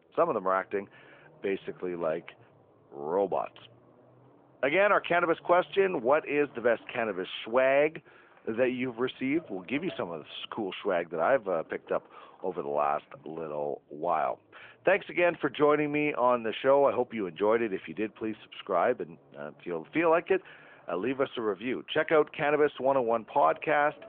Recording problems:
phone-call audio; nothing above 3.5 kHz
traffic noise; faint; throughout; 30 dB below the speech

